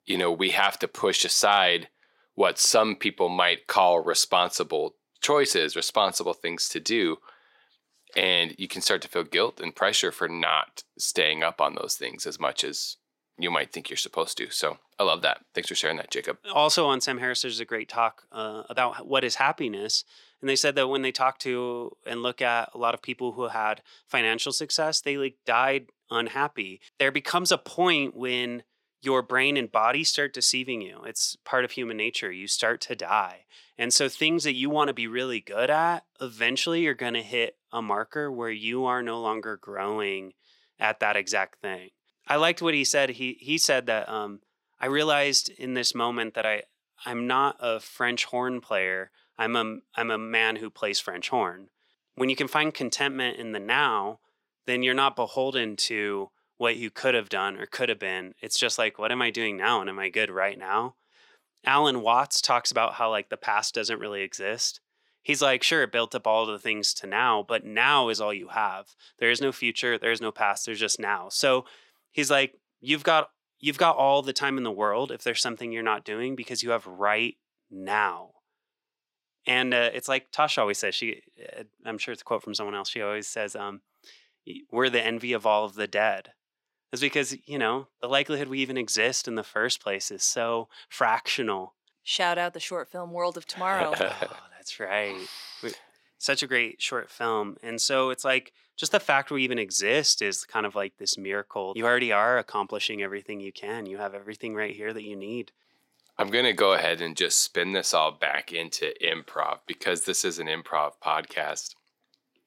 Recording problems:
thin; somewhat; fading below 450 Hz

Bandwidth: 16 kHz